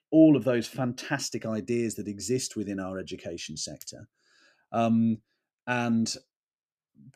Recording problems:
none

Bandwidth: 14.5 kHz